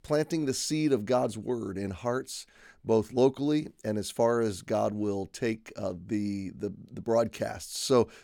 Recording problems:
none

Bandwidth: 17.5 kHz